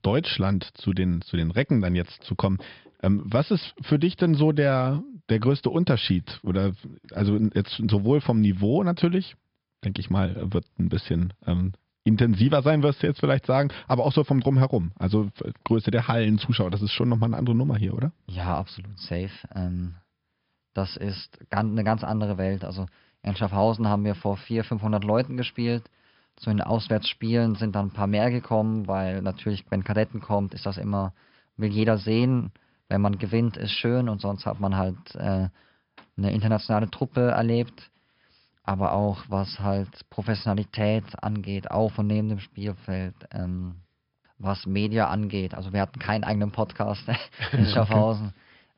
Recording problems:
high frequencies cut off; noticeable; nothing above 5.5 kHz

